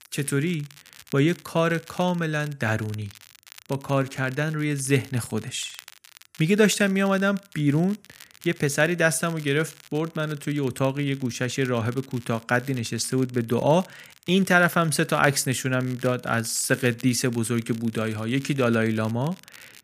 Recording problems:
crackle, like an old record; faint; 25 dB below the speech

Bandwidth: 15 kHz